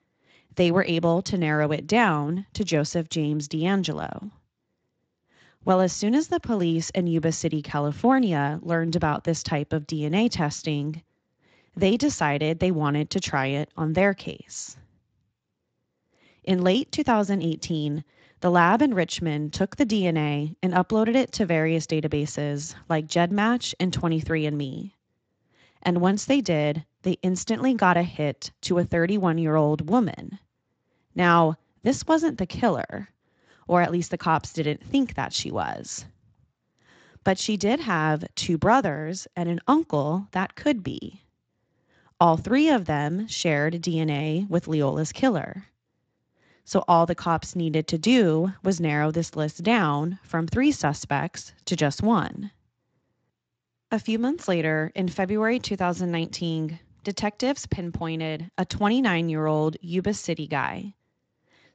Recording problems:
garbled, watery; slightly; nothing above 7.5 kHz

